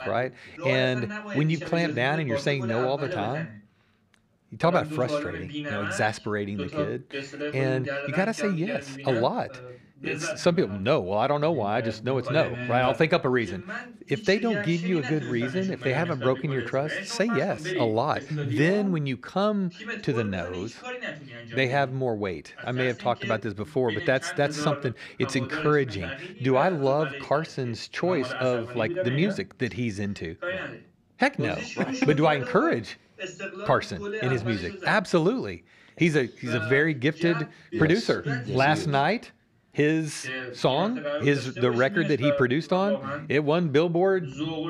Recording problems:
voice in the background; loud; throughout; 8 dB below the speech

